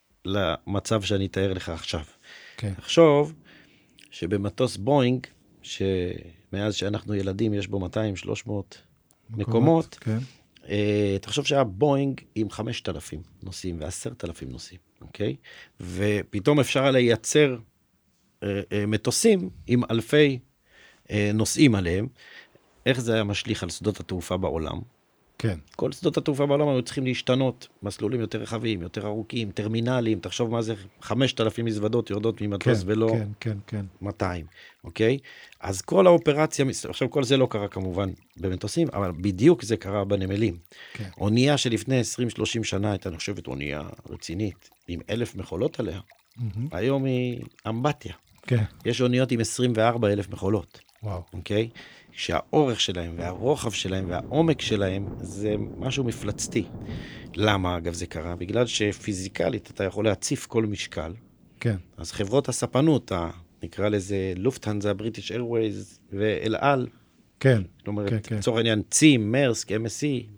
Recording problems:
rain or running water; faint; throughout; 25 dB below the speech

